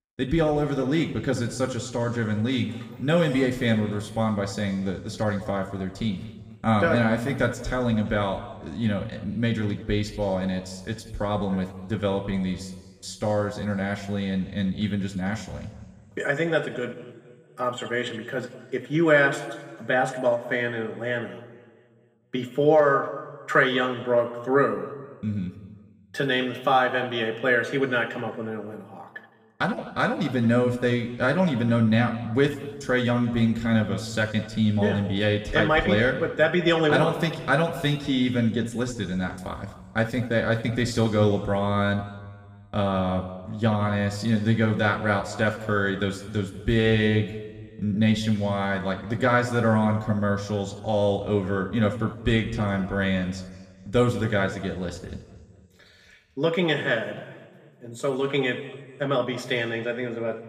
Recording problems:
room echo; slight; dies away in 1.4 s
off-mic speech; somewhat distant

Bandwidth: 15.5 kHz